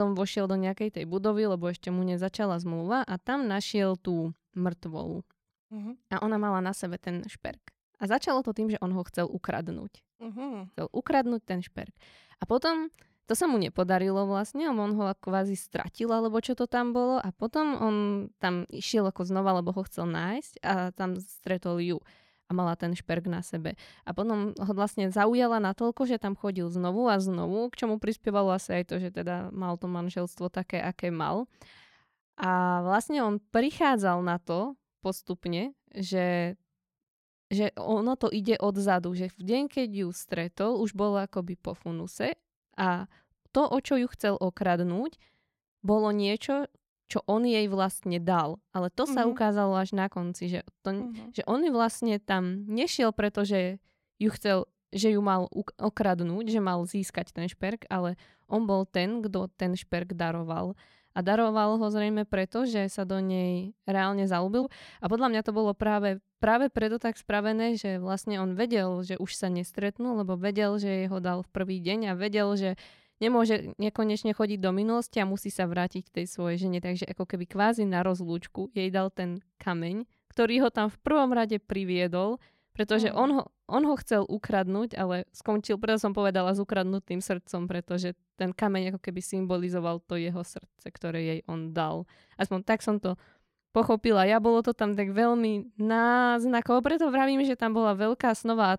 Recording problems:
abrupt cut into speech; at the start

